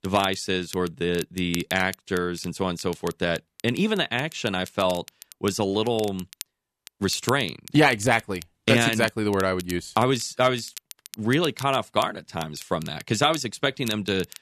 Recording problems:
crackle, like an old record; noticeable; 15 dB below the speech

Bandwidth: 13.5 kHz